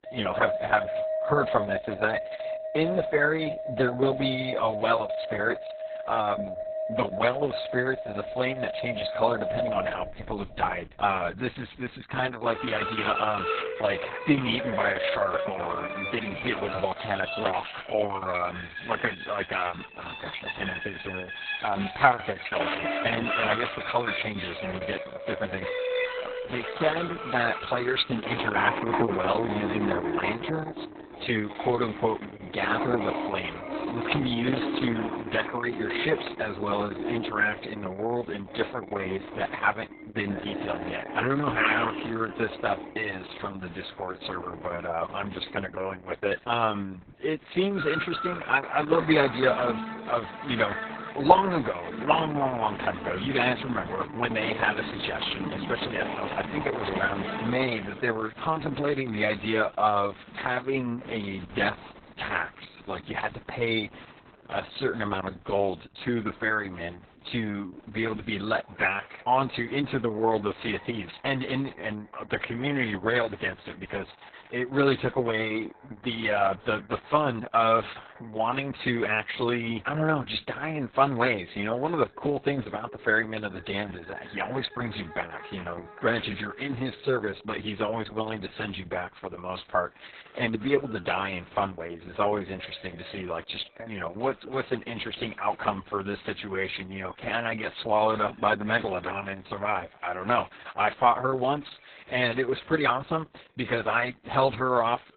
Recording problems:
garbled, watery; badly; nothing above 4 kHz
background music; loud; throughout; 5 dB below the speech

